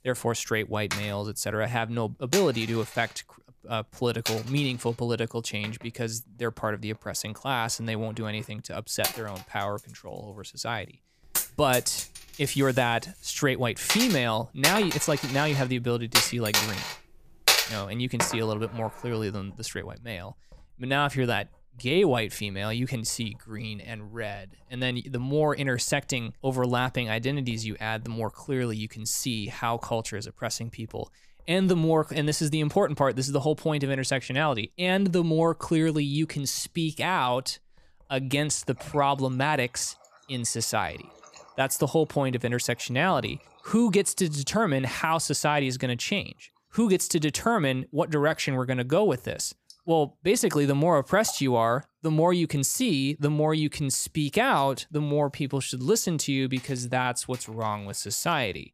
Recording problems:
household noises; loud; throughout; 3 dB below the speech

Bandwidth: 14.5 kHz